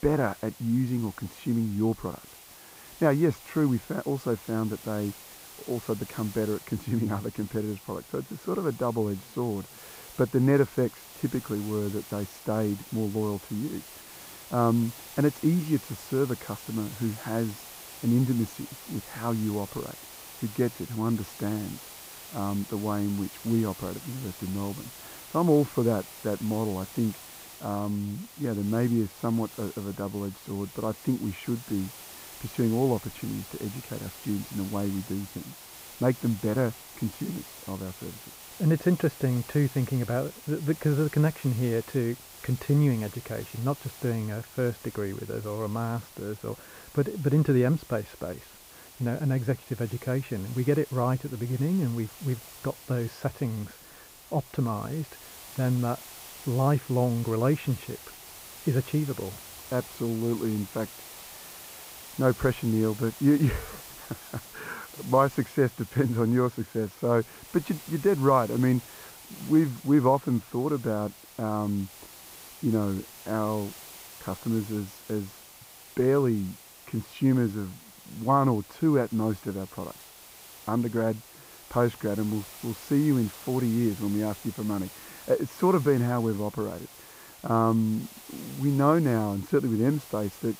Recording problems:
muffled; very; fading above 3 kHz
hiss; noticeable; throughout; 15 dB below the speech

